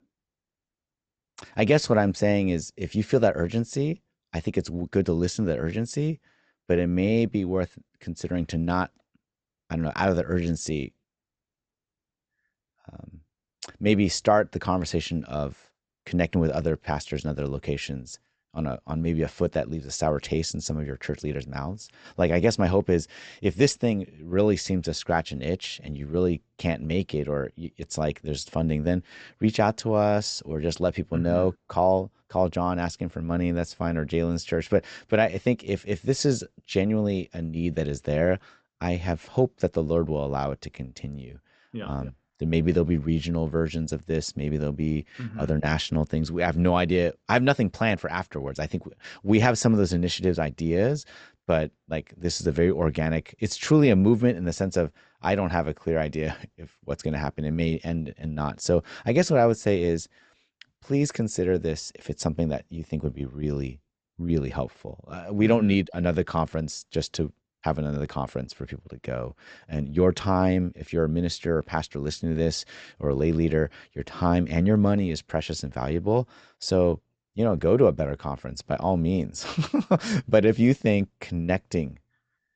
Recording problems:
high frequencies cut off; noticeable; nothing above 8 kHz

